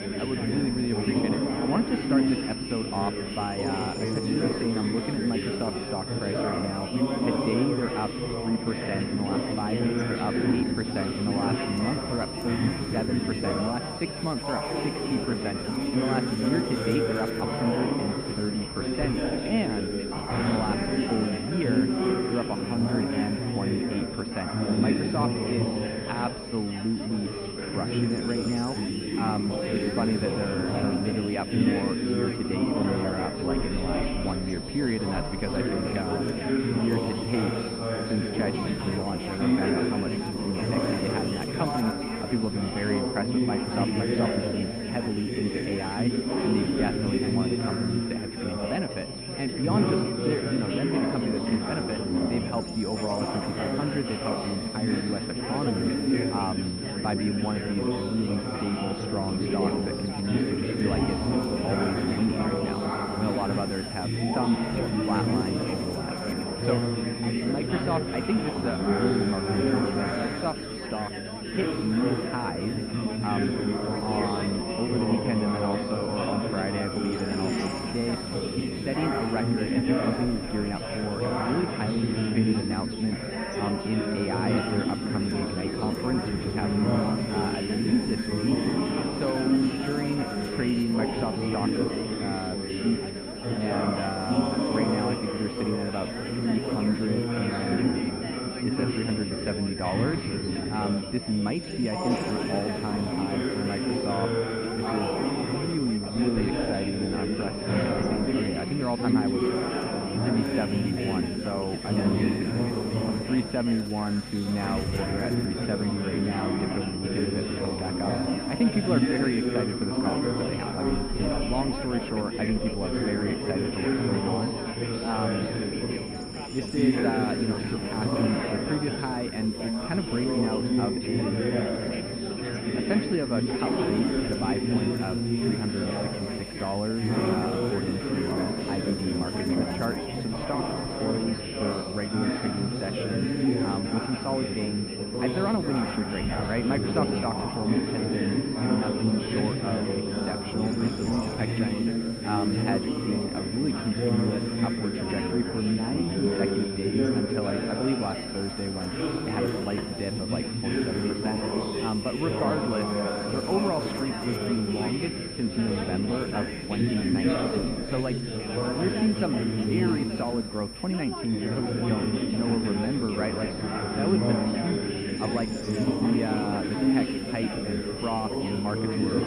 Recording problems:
muffled; very; fading above 3 kHz
chatter from many people; very loud; throughout; 2 dB above the speech
high-pitched whine; loud; throughout; 5.5 kHz, 8 dB below the speech
electrical hum; noticeable; throughout; 50 Hz, 20 dB below the speech

